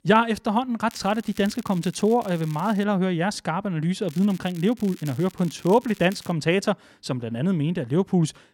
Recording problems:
crackling; faint; from 1 to 3 s and from 4 to 6.5 s; 20 dB below the speech

